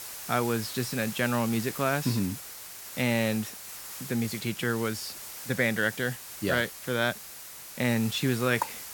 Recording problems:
hiss; loud; throughout; 10 dB below the speech

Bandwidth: 17.5 kHz